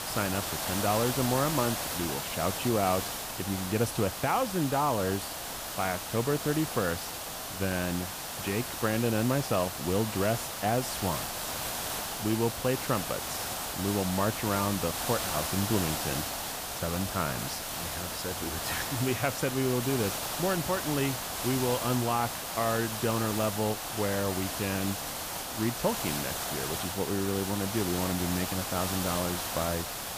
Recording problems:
hiss; loud; throughout; 2 dB below the speech

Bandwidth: 15 kHz